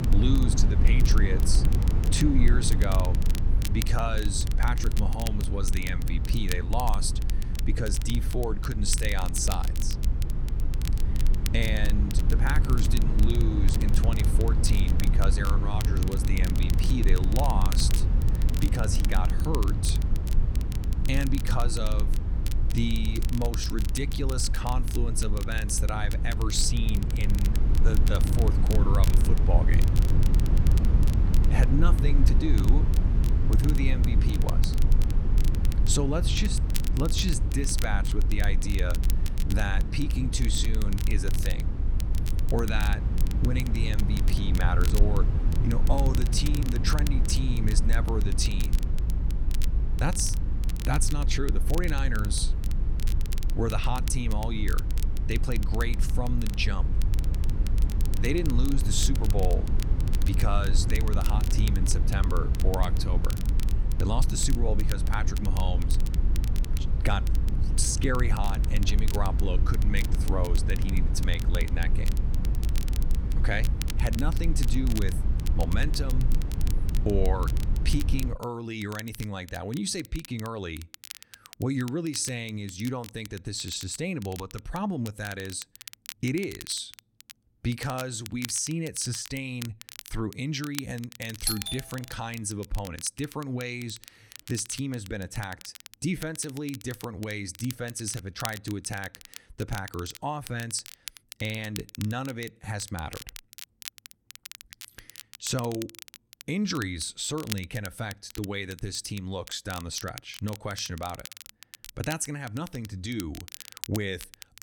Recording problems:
low rumble; loud; until 1:18; 8 dB below the speech
crackle, like an old record; noticeable; 10 dB below the speech
doorbell; loud; at 1:31; peak 4 dB above the speech

